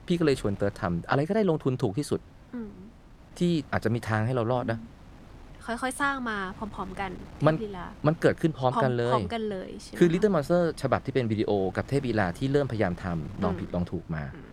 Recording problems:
wind noise on the microphone; occasional gusts; 25 dB below the speech

